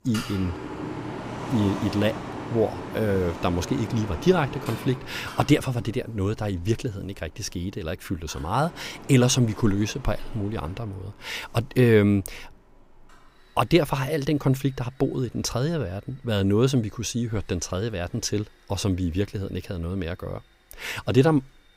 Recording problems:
machinery noise; noticeable; throughout; 10 dB below the speech

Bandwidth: 15.5 kHz